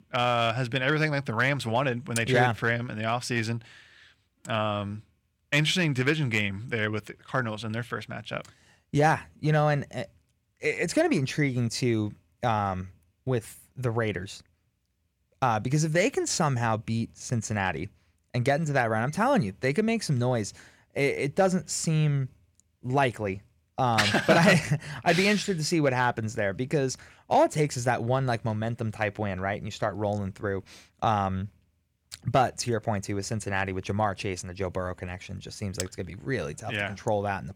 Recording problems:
none

